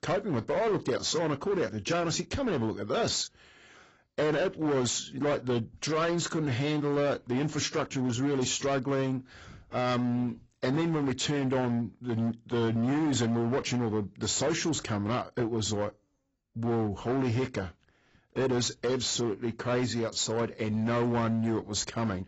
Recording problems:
garbled, watery; badly; nothing above 7.5 kHz
distortion; slight; 15% of the sound clipped

